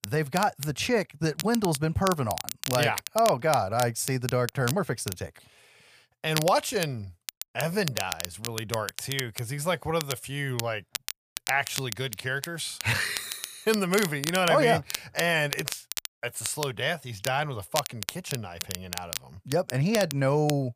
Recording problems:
crackle, like an old record; loud; 8 dB below the speech

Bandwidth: 15 kHz